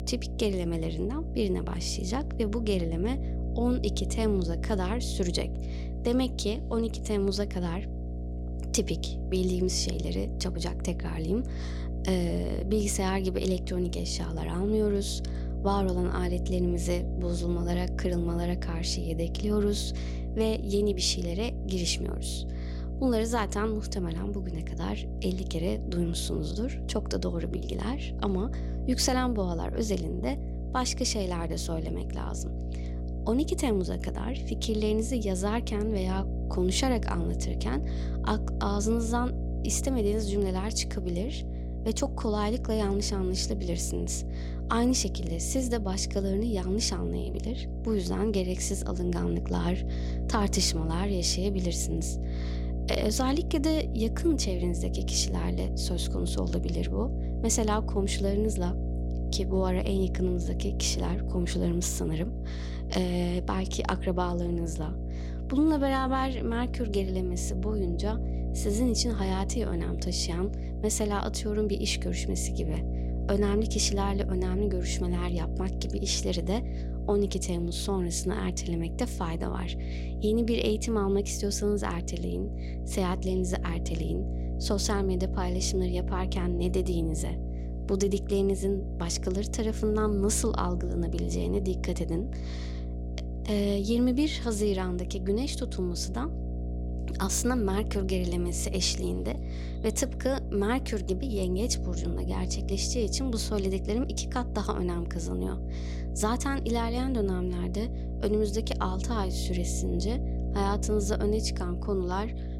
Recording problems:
electrical hum; noticeable; throughout; 60 Hz, 10 dB below the speech

